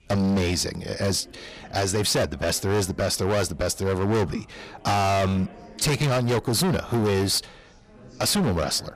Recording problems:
distortion; heavy; 21% of the sound clipped
chatter from many people; faint; throughout; 25 dB below the speech

